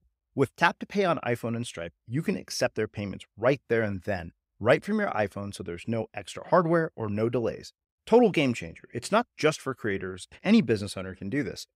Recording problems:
none

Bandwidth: 15.5 kHz